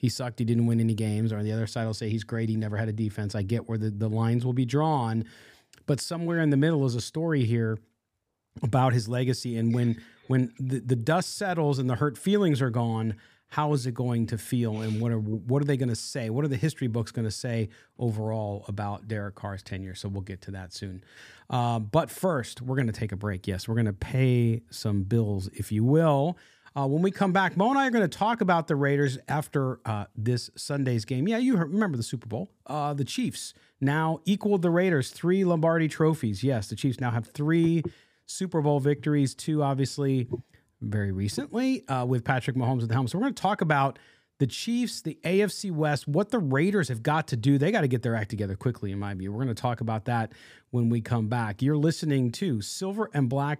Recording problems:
none

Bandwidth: 15 kHz